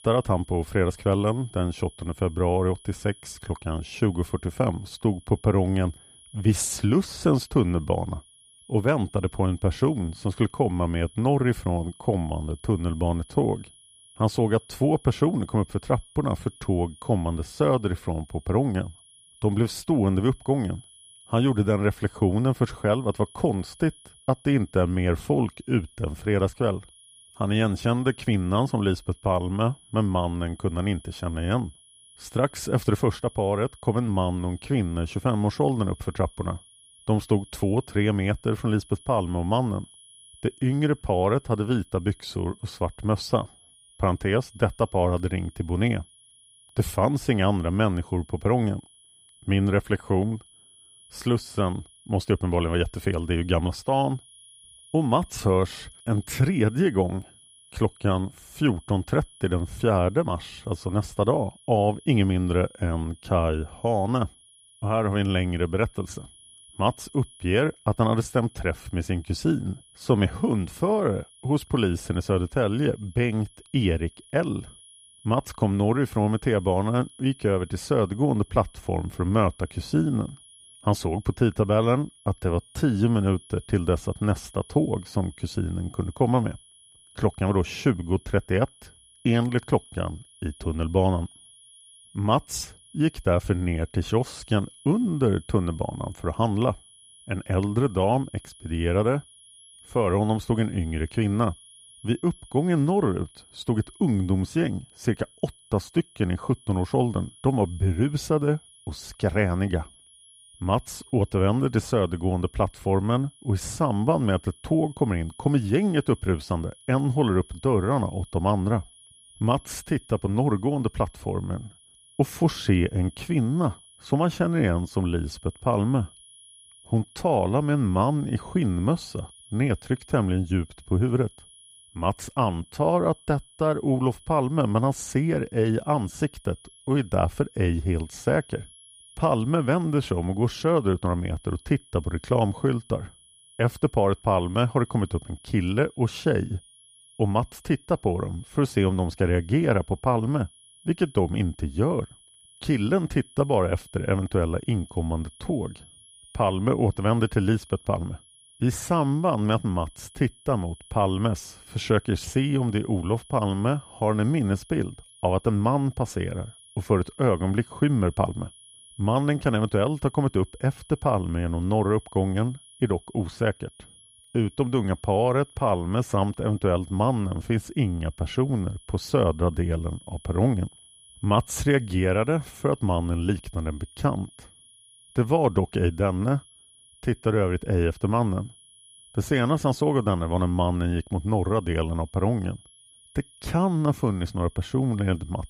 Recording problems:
high-pitched whine; faint; throughout; 10.5 kHz, 25 dB below the speech

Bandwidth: 15 kHz